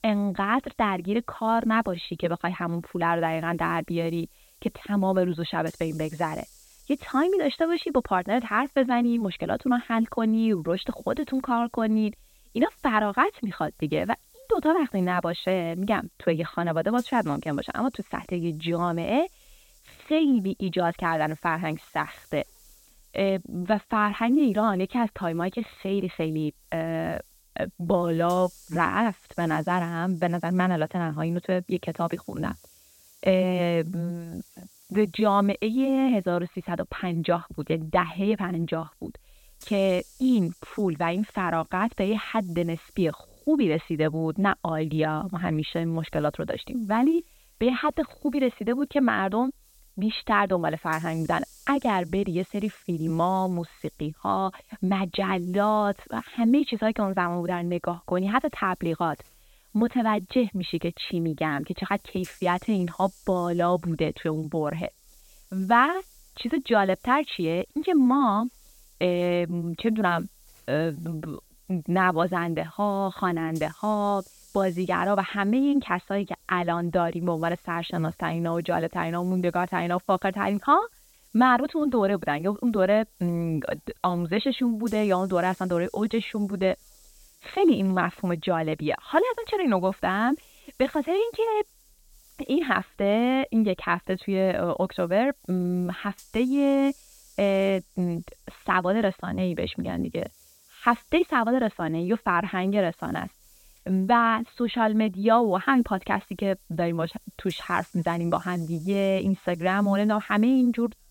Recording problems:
high frequencies cut off; severe; nothing above 4 kHz
hiss; faint; throughout; 30 dB below the speech

